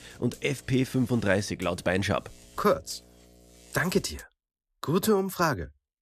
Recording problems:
electrical hum; faint; until 4 s; 60 Hz, 25 dB below the speech

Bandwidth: 14.5 kHz